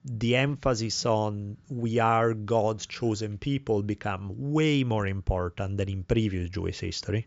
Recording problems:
high frequencies cut off; noticeable; nothing above 7.5 kHz

